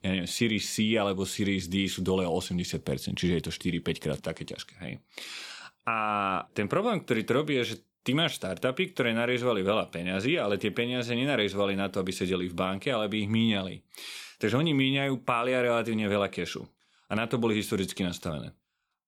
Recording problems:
none

